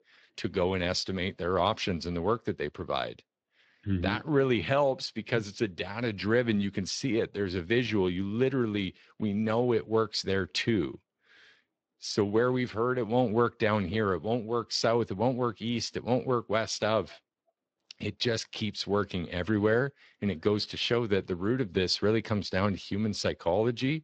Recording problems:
garbled, watery; slightly

